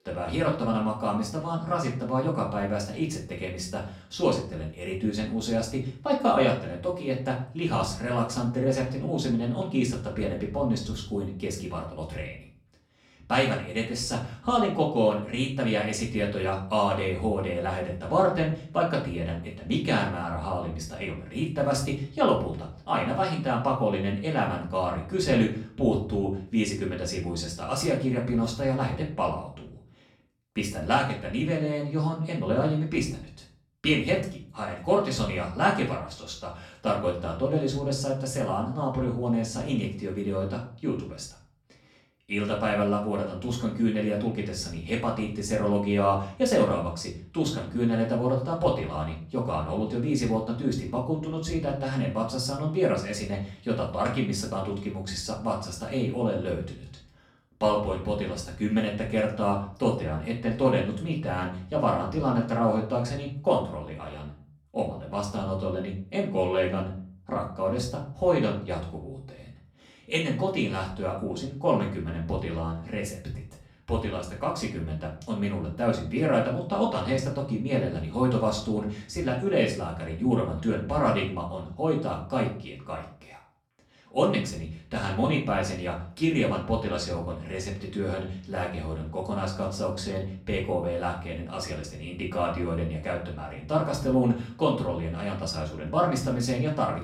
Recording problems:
off-mic speech; far
room echo; slight; dies away in 0.4 s

